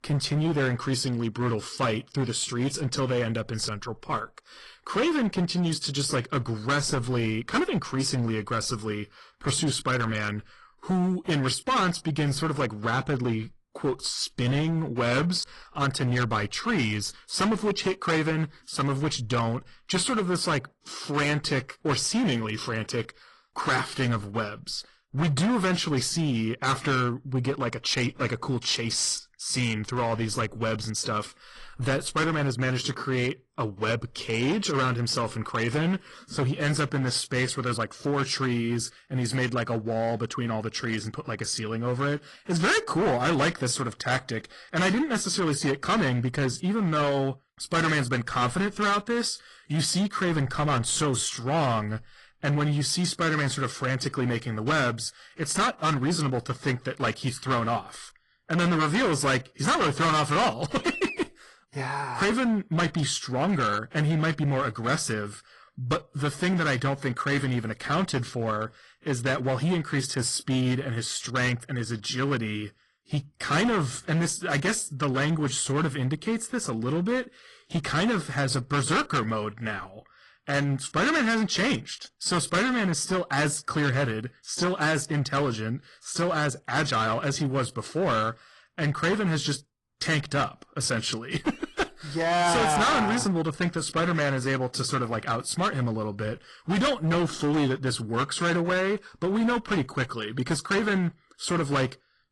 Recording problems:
distortion; heavy; 13% of the sound clipped
garbled, watery; slightly

